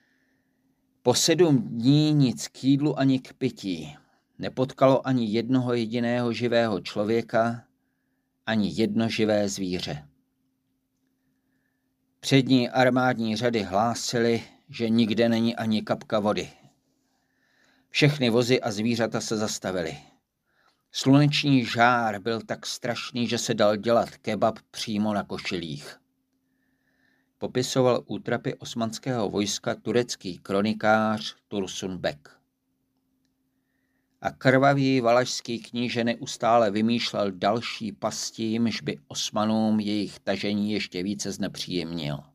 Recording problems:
none

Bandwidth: 15 kHz